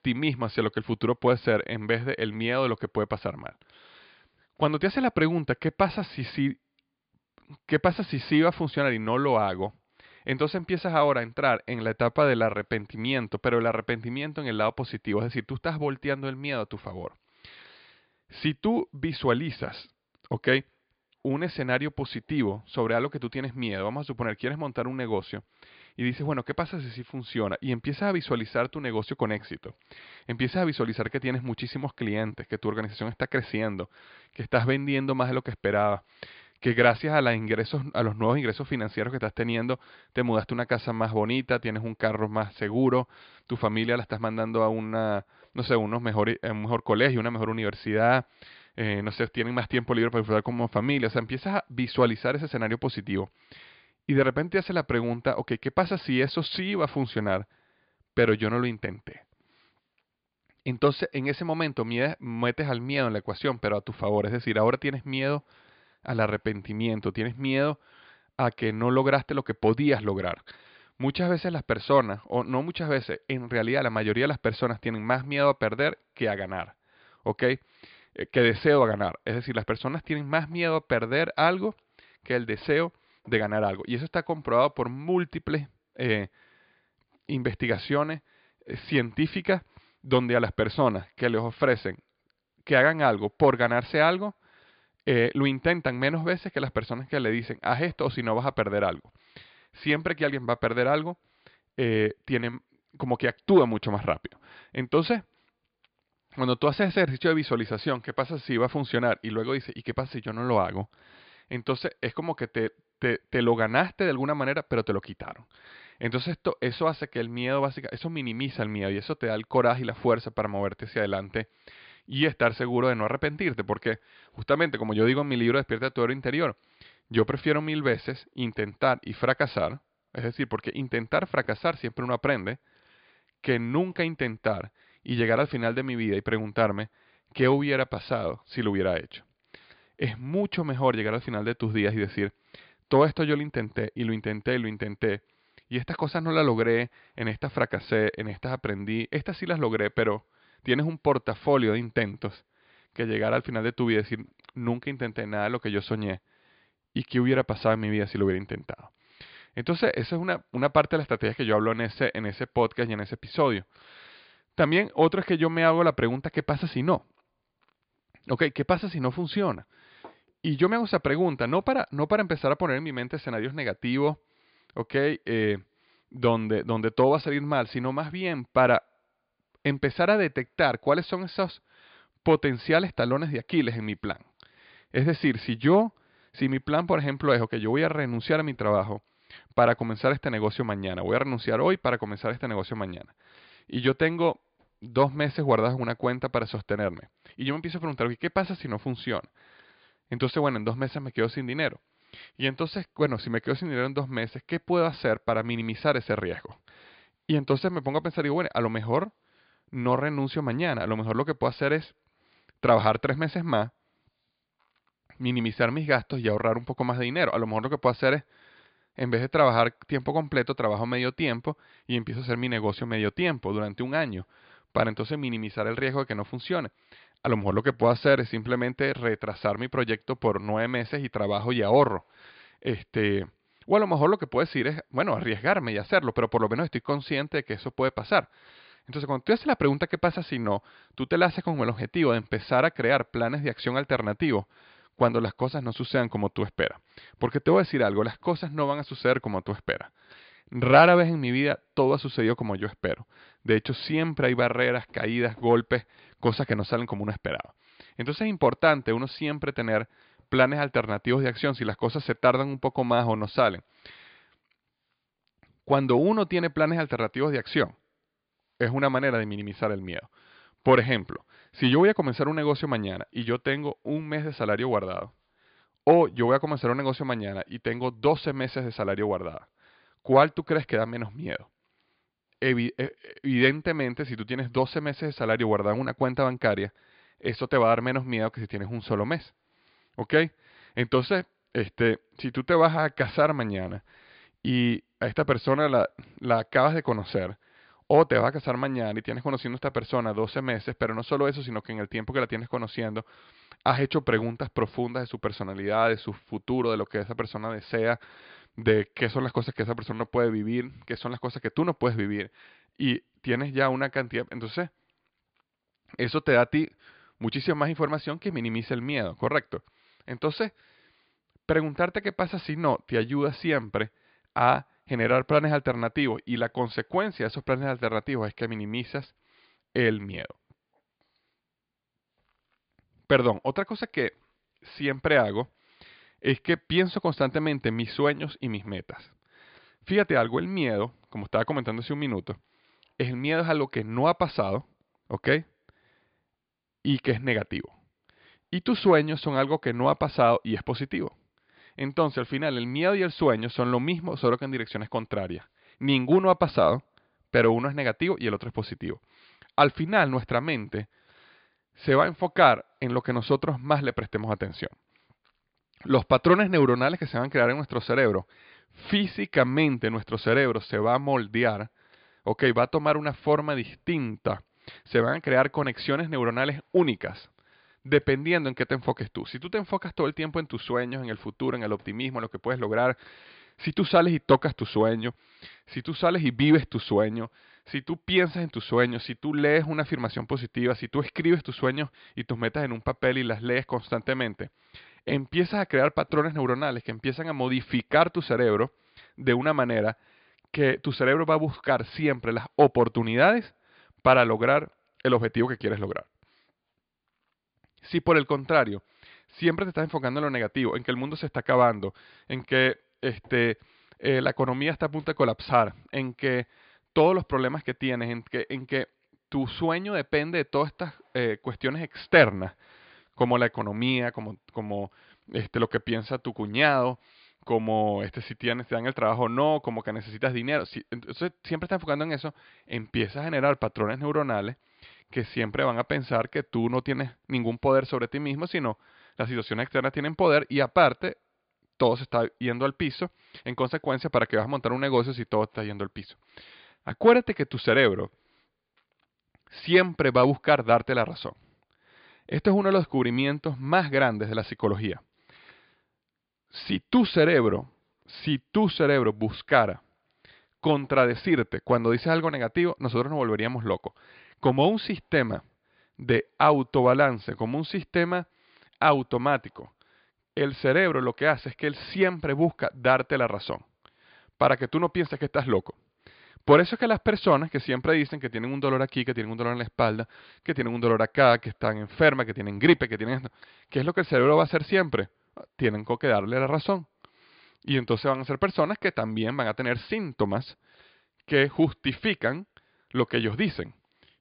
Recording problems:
high frequencies cut off; severe; nothing above 5 kHz

